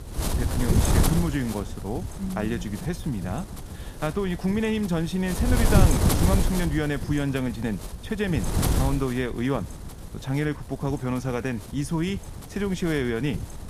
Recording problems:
wind noise on the microphone; heavy; 3 dB below the speech

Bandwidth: 15 kHz